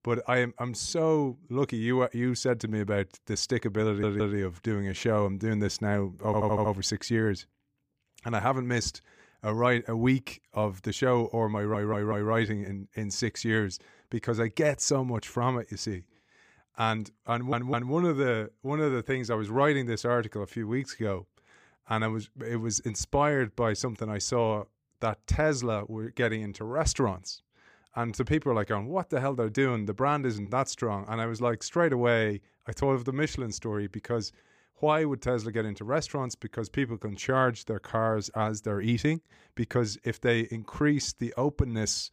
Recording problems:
audio stuttering; 4 times, first at 4 s

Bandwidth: 15 kHz